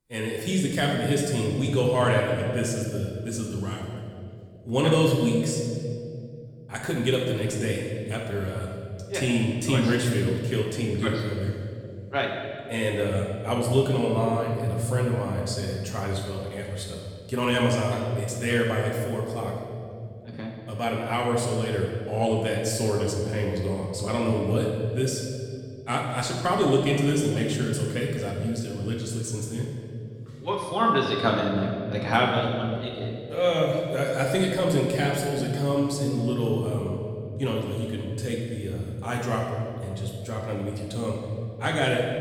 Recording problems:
off-mic speech; far
room echo; noticeable; dies away in 2.3 s

